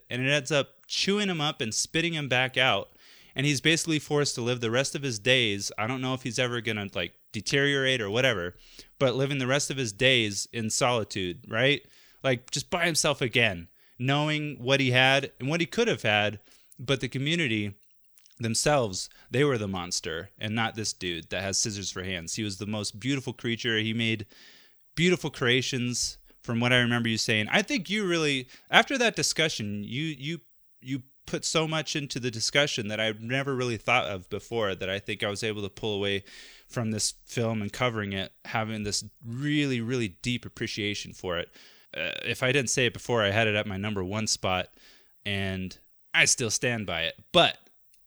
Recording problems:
none

